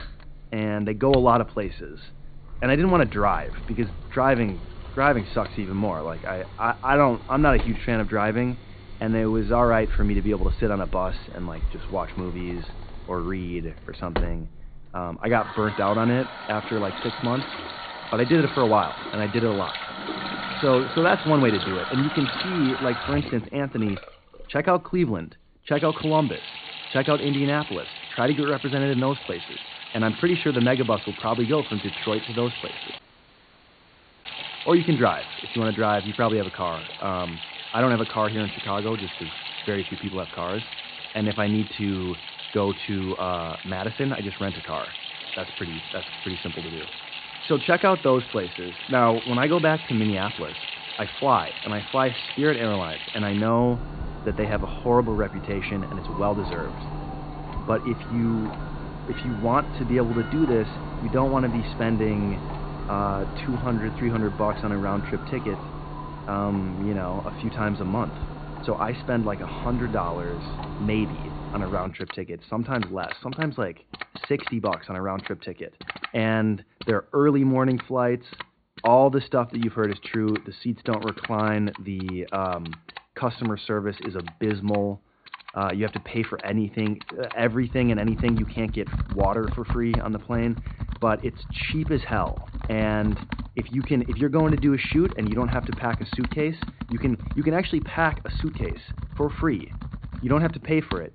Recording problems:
high frequencies cut off; severe; nothing above 4.5 kHz
garbled, watery; slightly
household noises; loud; throughout; 9 dB below the speech
audio cutting out; at 33 s for 1.5 s

